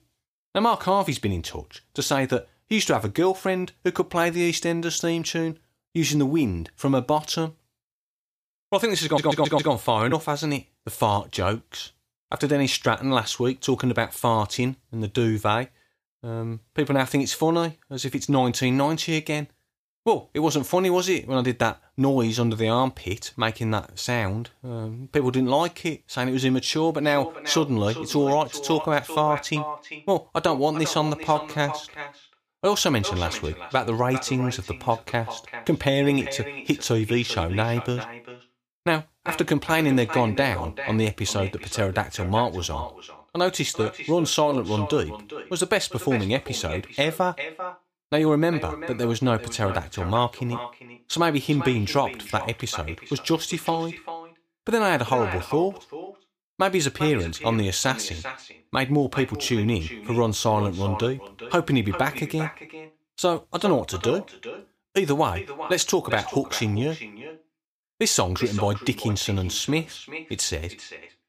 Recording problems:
echo of what is said; strong; from 27 s on; 390 ms later, 10 dB below the speech
audio stuttering; at 9 s

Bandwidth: 15 kHz